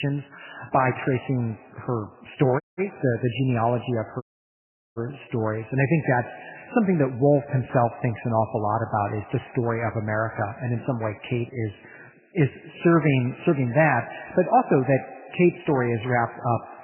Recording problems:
garbled, watery; badly; nothing above 3 kHz
echo of what is said; faint; throughout; 110 ms later, 20 dB below the speech
muffled; very slightly; fading above 4 kHz
abrupt cut into speech; at the start
audio cutting out; at 2.5 s and at 4 s for 0.5 s

